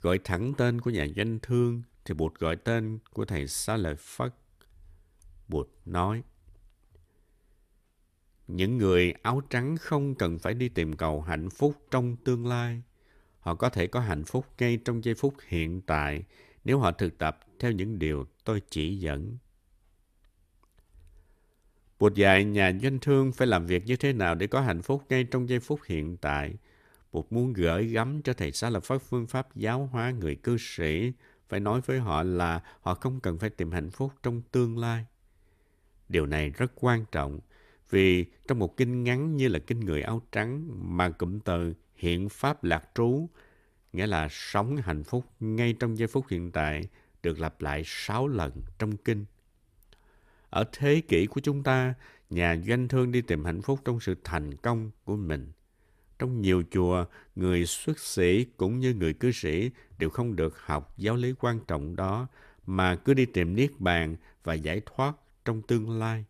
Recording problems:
none

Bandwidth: 14.5 kHz